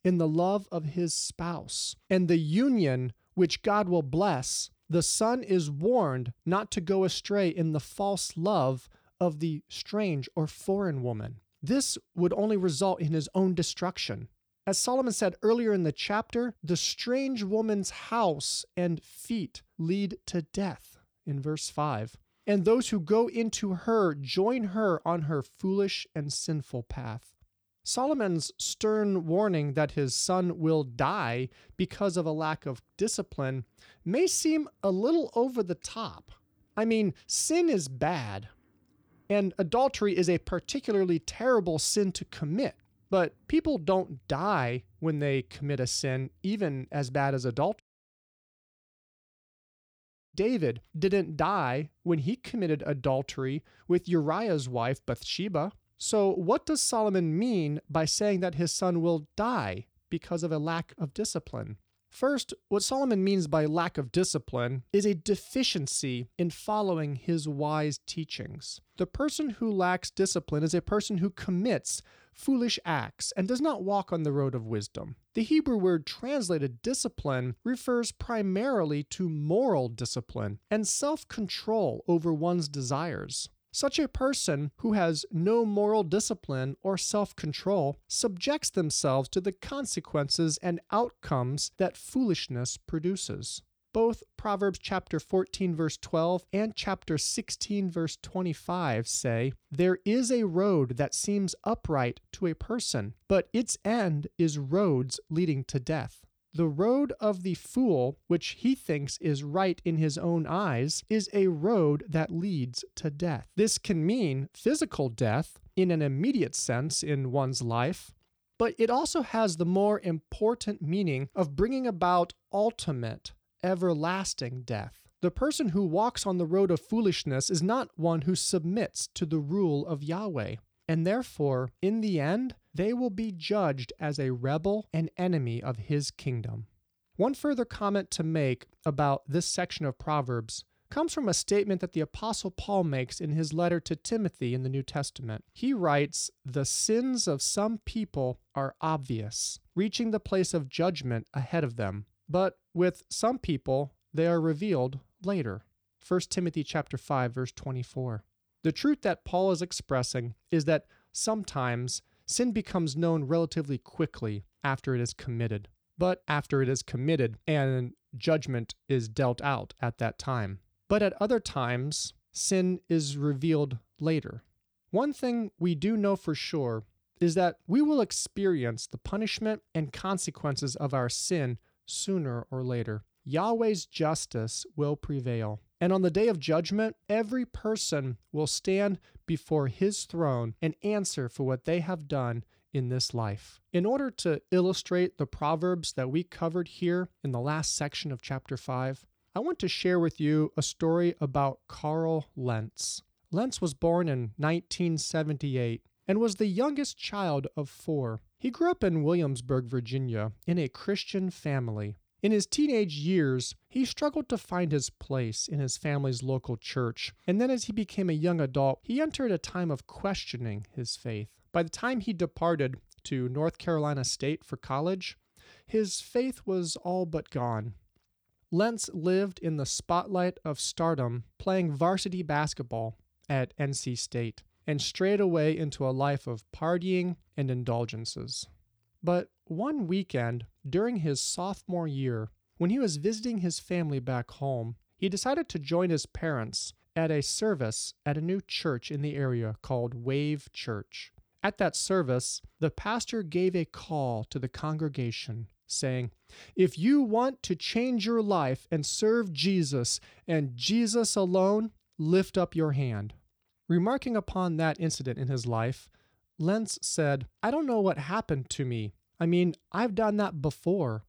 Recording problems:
audio cutting out; at 48 s for 2.5 s

